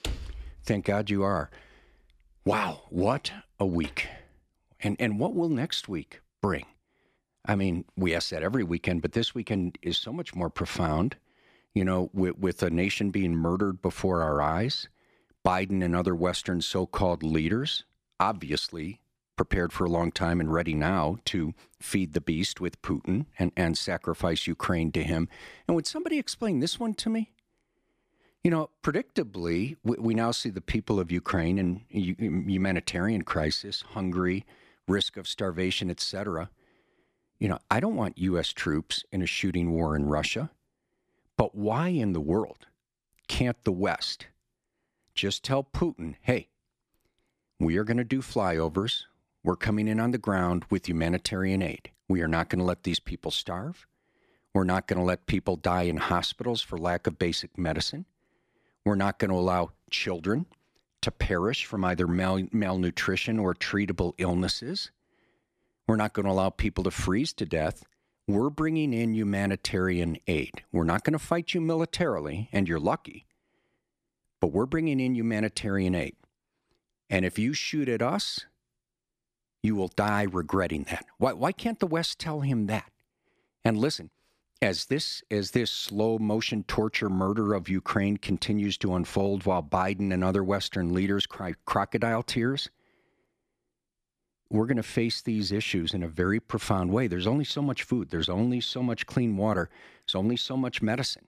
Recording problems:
none

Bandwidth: 14.5 kHz